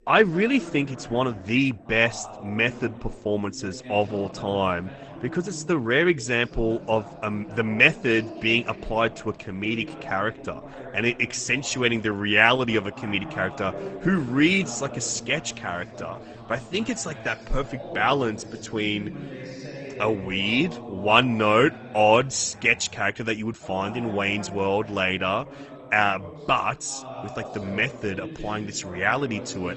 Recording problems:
garbled, watery; slightly; nothing above 8 kHz
voice in the background; noticeable; throughout; 15 dB below the speech

